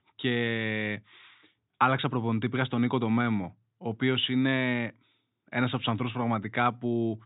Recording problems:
high frequencies cut off; severe; nothing above 4 kHz

